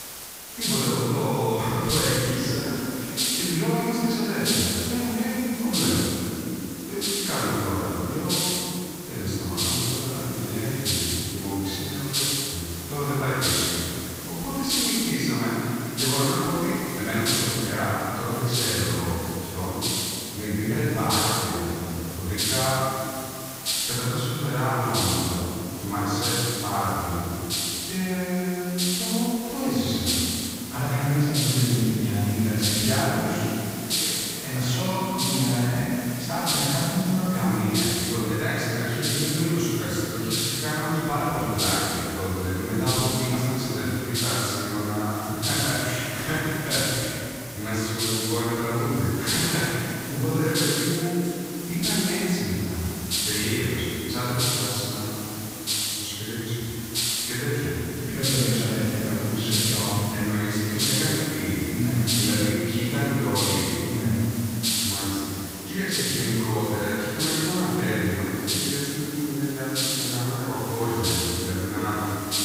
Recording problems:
room echo; strong; dies away in 2.9 s
off-mic speech; far
hiss; loud; throughout; 1 dB below the speech

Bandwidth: 15.5 kHz